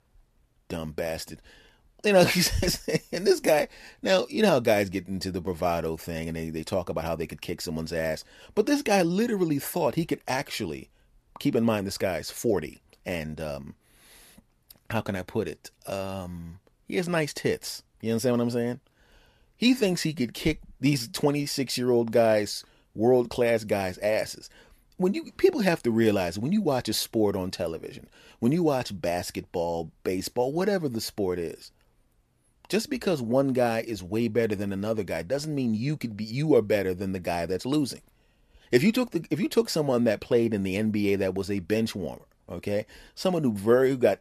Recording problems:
none

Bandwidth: 14.5 kHz